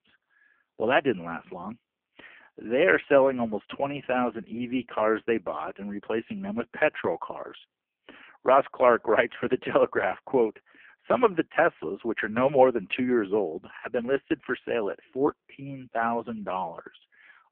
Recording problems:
phone-call audio; poor line

